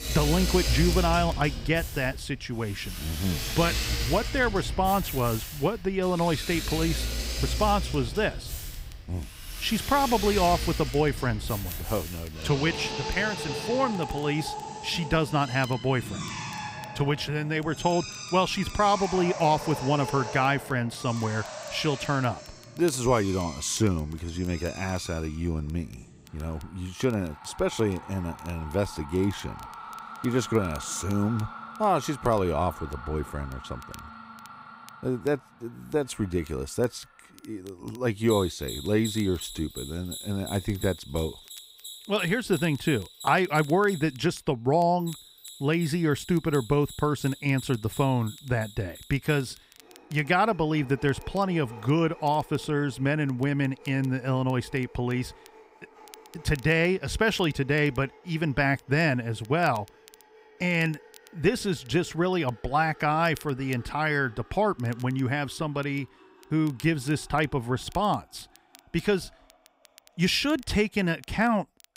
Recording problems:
machinery noise; loud; throughout; 9 dB below the speech
crackle, like an old record; faint; 25 dB below the speech

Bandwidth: 15.5 kHz